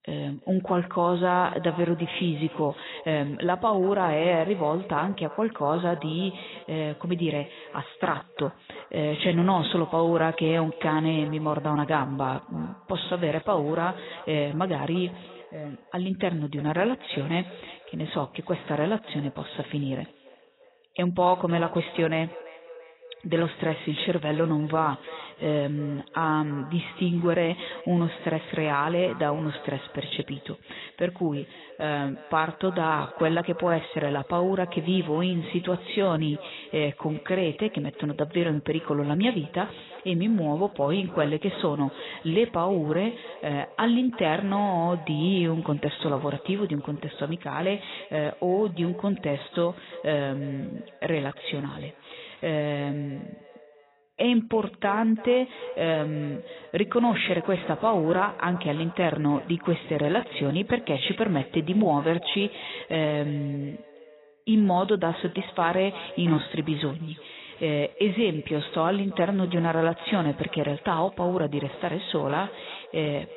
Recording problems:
garbled, watery; badly; nothing above 4 kHz
echo of what is said; noticeable; throughout; 340 ms later, 20 dB below the speech

